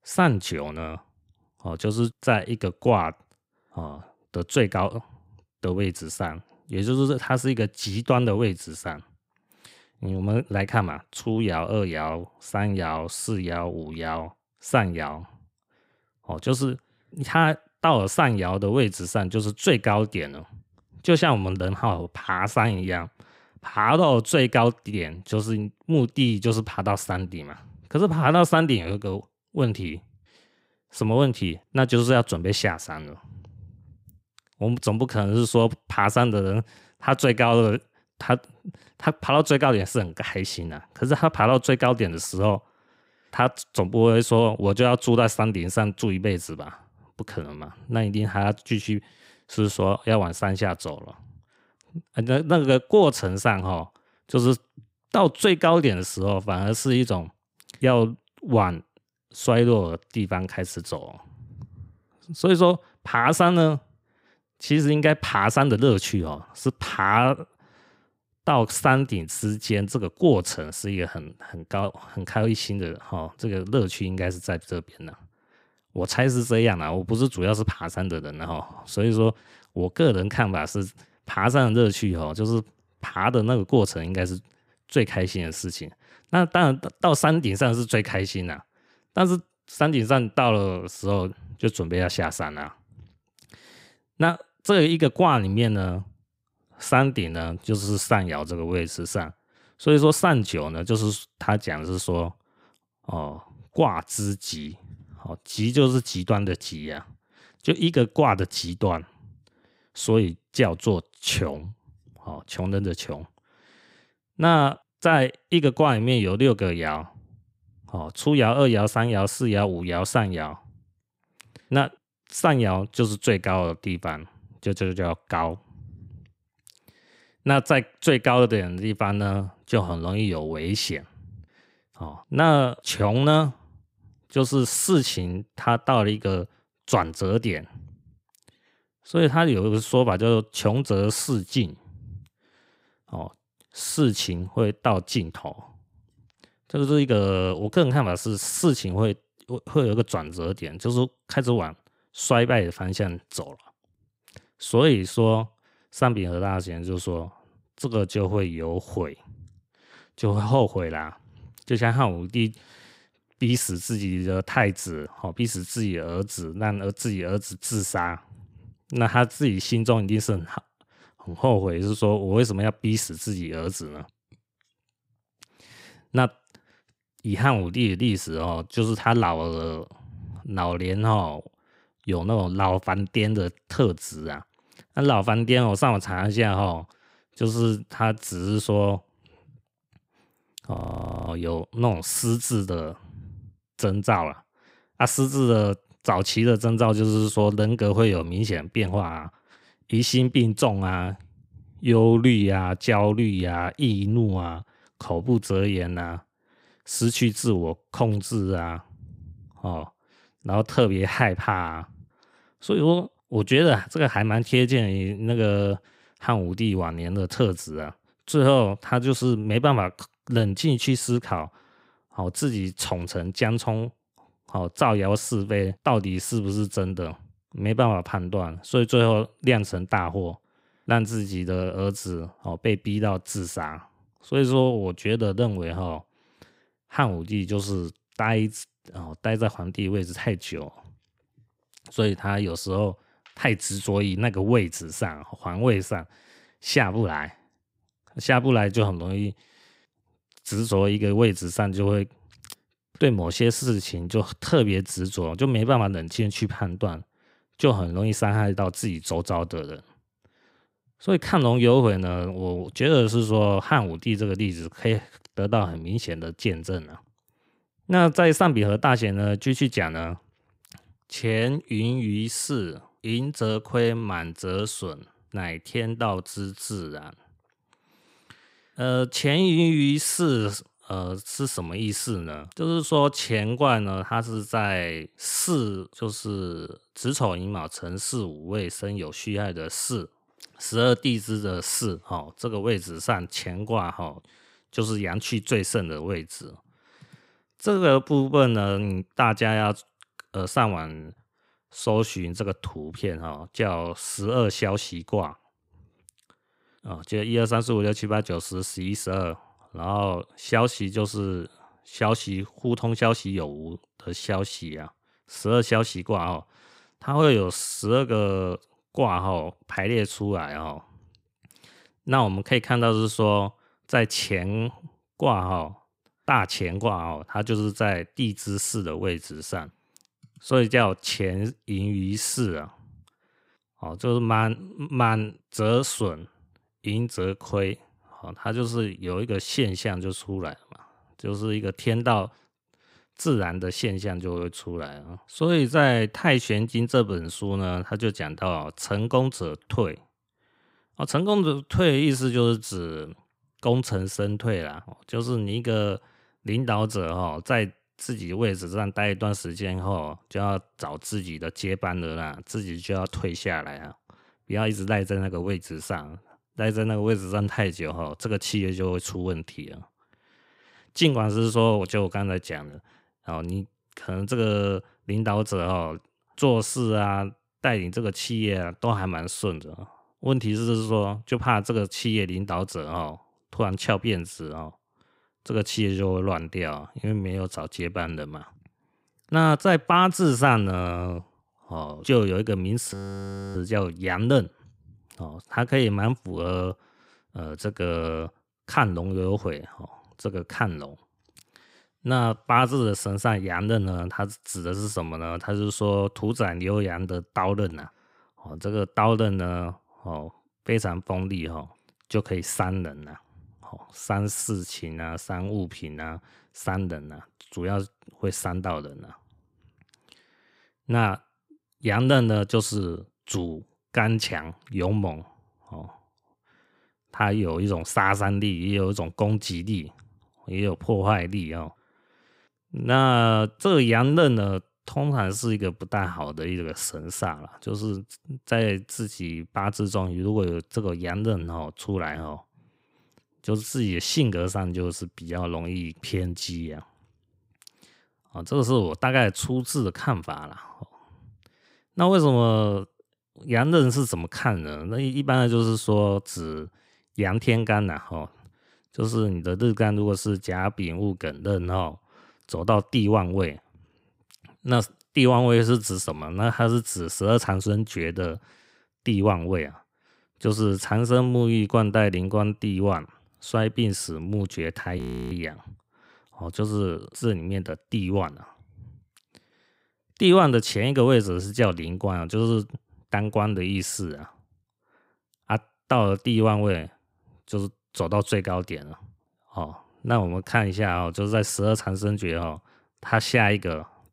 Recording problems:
audio freezing; at 3:11 for 0.5 s, at 6:33 for 0.5 s and at 7:55

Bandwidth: 15.5 kHz